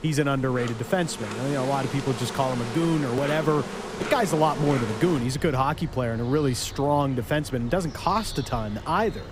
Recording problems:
animal sounds; loud; throughout; 10 dB below the speech

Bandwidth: 15.5 kHz